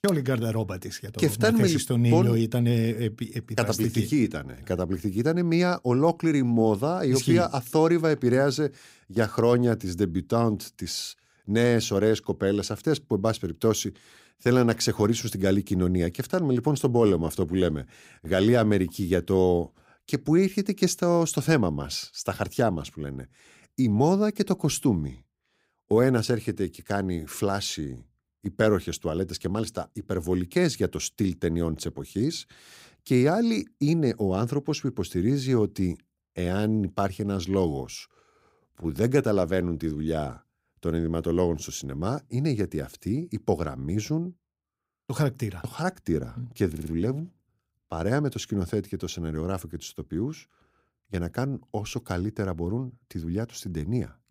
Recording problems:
audio stuttering; at 47 s

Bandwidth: 15.5 kHz